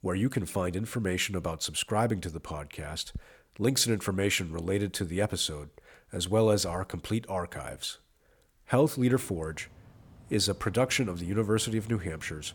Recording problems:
machinery noise; faint; throughout; 25 dB below the speech

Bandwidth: 18.5 kHz